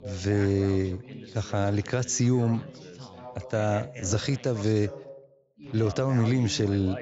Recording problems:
high frequencies cut off; noticeable; nothing above 8 kHz
background chatter; noticeable; throughout; 3 voices, 15 dB below the speech

